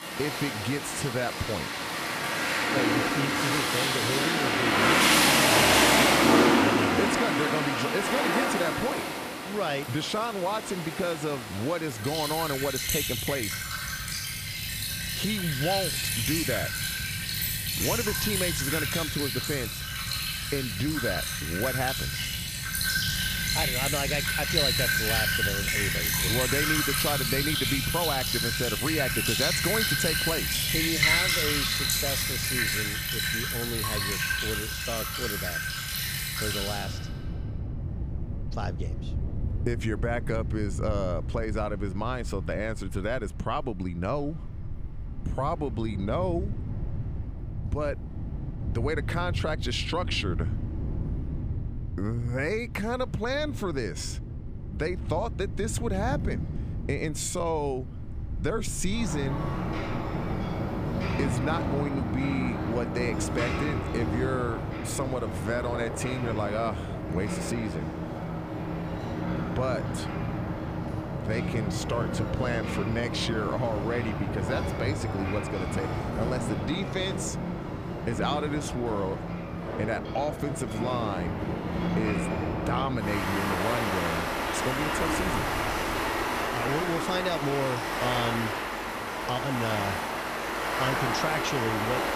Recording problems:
rain or running water; very loud; throughout; 4 dB above the speech

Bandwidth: 15 kHz